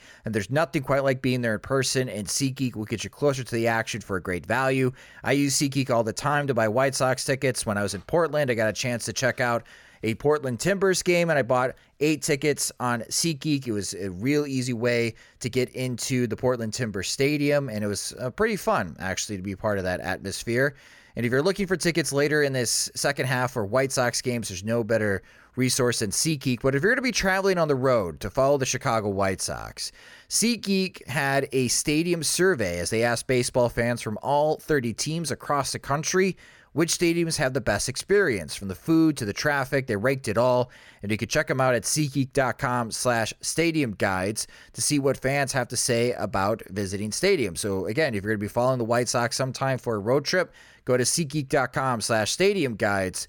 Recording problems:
none

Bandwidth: 17.5 kHz